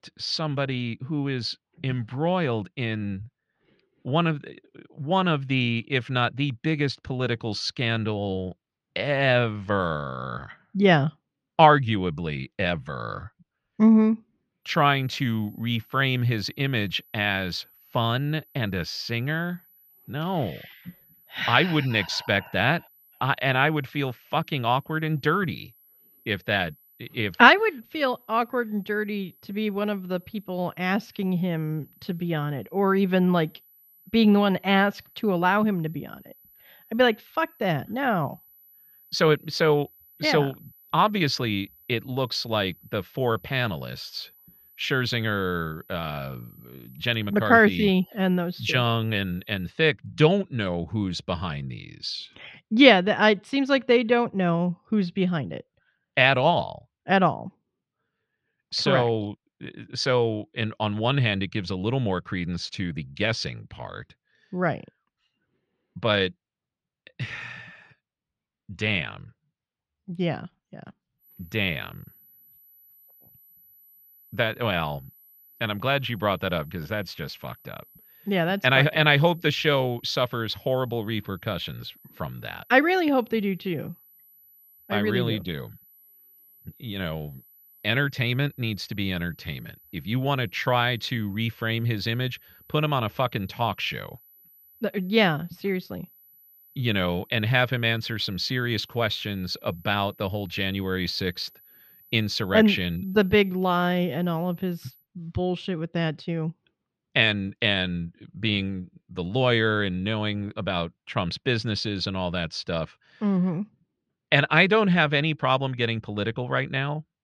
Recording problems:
muffled; very slightly; fading above 3 kHz
high-pitched whine; faint; from 15 to 50 s and from 1:11 to 1:45; 12 kHz, 30 dB below the speech

